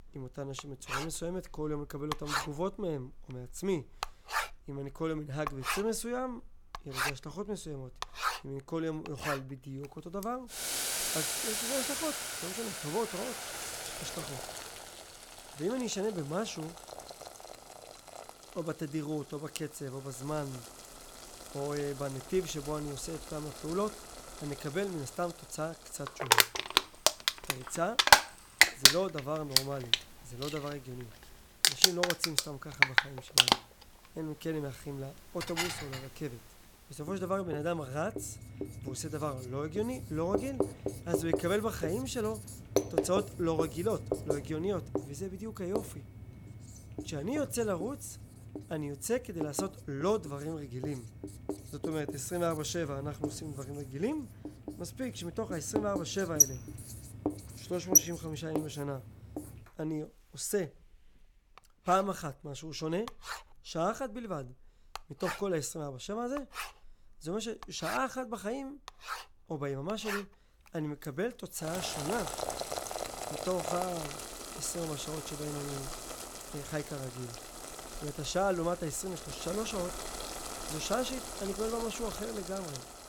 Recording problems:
household noises; very loud; throughout; 4 dB above the speech
keyboard typing; faint; from 26 to 29 s; peak 15 dB below the speech
clattering dishes; loud; at 35 s; peak 2 dB above the speech

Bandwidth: 17.5 kHz